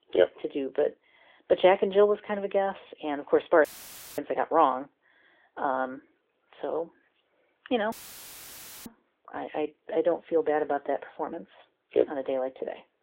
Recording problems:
phone-call audio; nothing above 3.5 kHz
audio cutting out; filled with static; at 3.5 s for 0.5 s and at 8 s for 1 s

